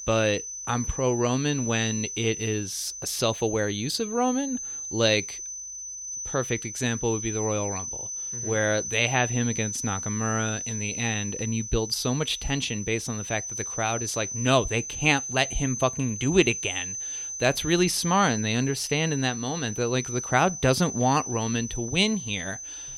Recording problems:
high-pitched whine; loud; throughout; 6 kHz, 6 dB below the speech

